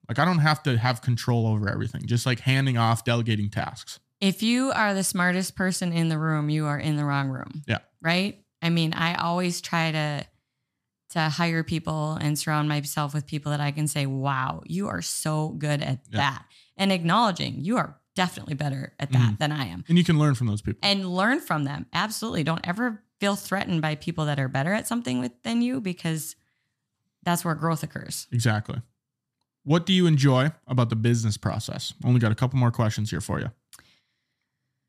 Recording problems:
none

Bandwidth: 14 kHz